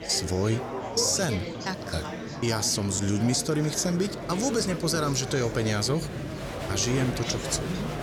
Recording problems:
murmuring crowd; loud; throughout; 7 dB below the speech

